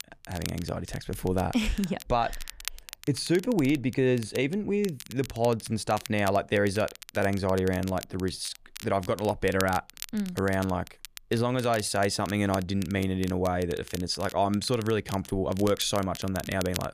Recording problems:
crackle, like an old record; noticeable; 15 dB below the speech

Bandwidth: 14.5 kHz